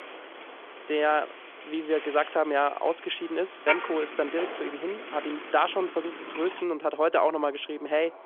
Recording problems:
phone-call audio; nothing above 3.5 kHz
traffic noise; loud; throughout; 9 dB below the speech

